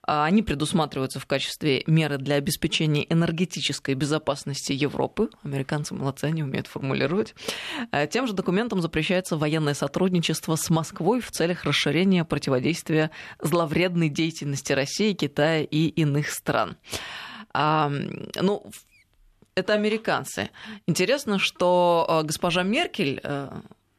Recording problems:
none

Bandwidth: 13.5 kHz